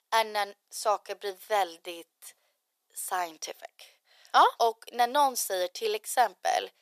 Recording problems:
thin; very; fading below 450 Hz

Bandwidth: 14.5 kHz